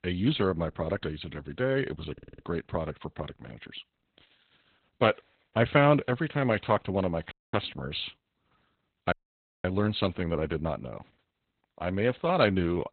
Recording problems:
garbled, watery; badly; nothing above 4 kHz
audio stuttering; at 2 s
audio cutting out; at 7.5 s and at 9 s for 0.5 s

